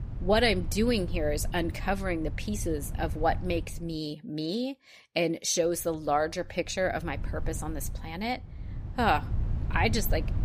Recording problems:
low rumble; noticeable; until 4 s and from 5.5 s on; 20 dB below the speech

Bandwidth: 15 kHz